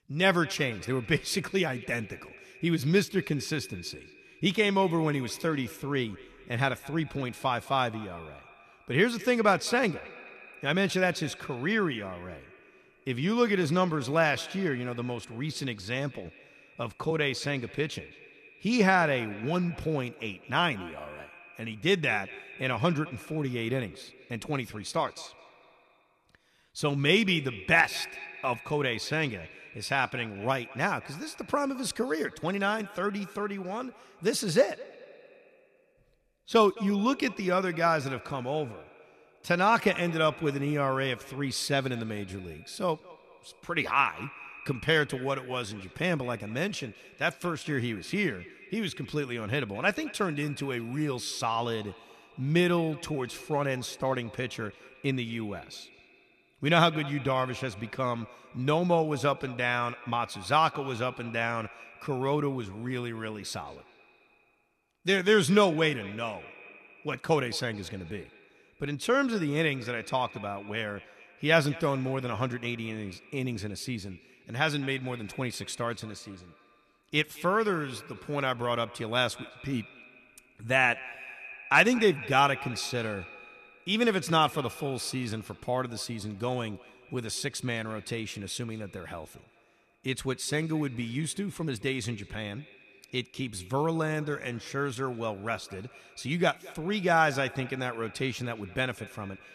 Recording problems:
echo of what is said; noticeable; throughout; 210 ms later, 20 dB below the speech

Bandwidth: 13.5 kHz